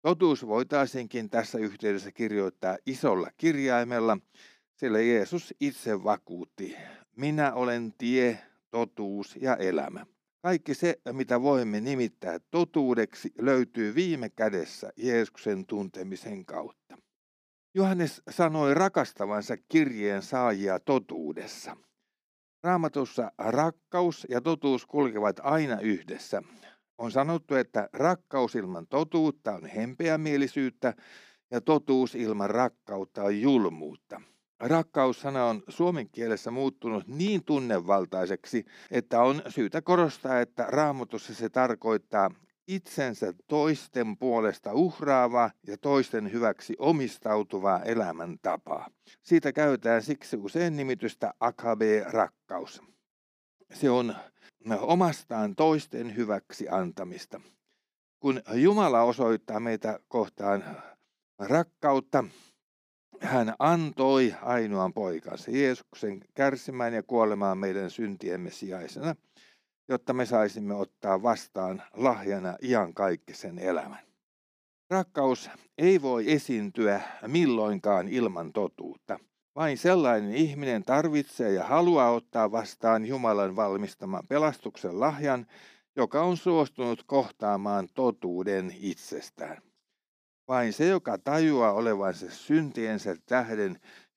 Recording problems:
none

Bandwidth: 15 kHz